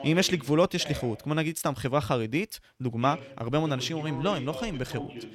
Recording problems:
voice in the background; noticeable; throughout; 10 dB below the speech

